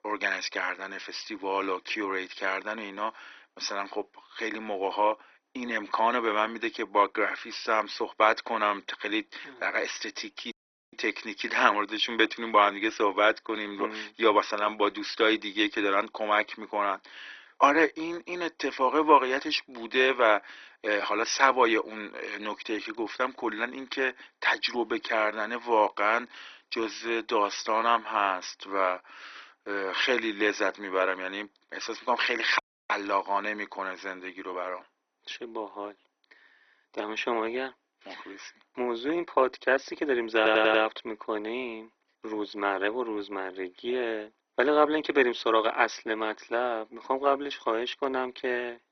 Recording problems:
garbled, watery; badly; nothing above 6 kHz
thin; very; fading below 300 Hz
audio cutting out; at 11 s and at 33 s
audio stuttering; at 40 s

